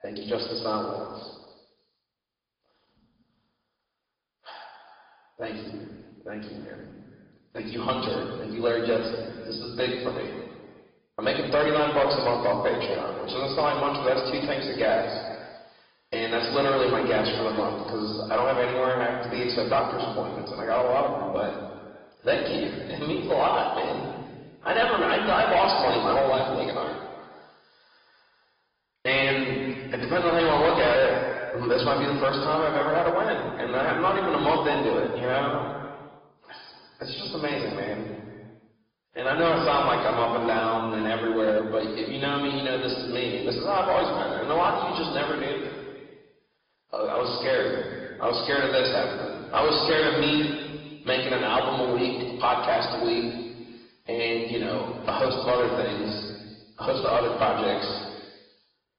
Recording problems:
off-mic speech; far
room echo; noticeable; dies away in 1.5 s
high frequencies cut off; noticeable; nothing above 5 kHz
distortion; slight; 4% of the sound clipped
garbled, watery; slightly

